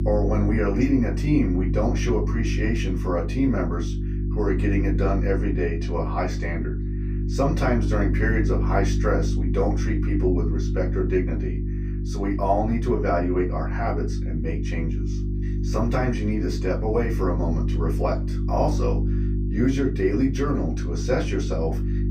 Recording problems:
off-mic speech; far
room echo; very slight; dies away in 0.2 s
electrical hum; loud; throughout; 50 Hz, 9 dB below the speech

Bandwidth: 15.5 kHz